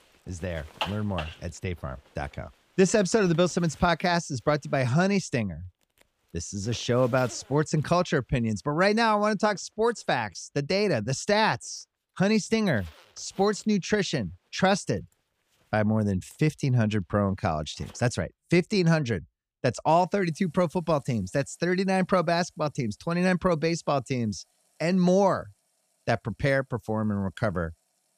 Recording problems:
household noises; noticeable; throughout; 20 dB below the speech

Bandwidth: 15 kHz